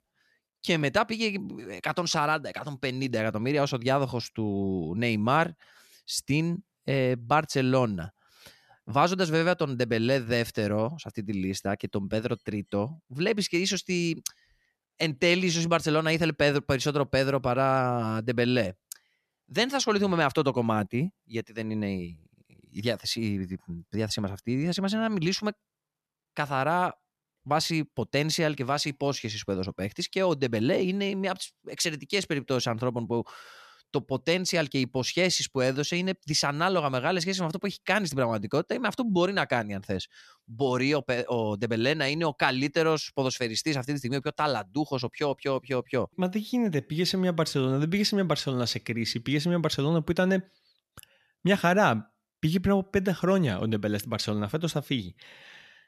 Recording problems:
none

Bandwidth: 13.5 kHz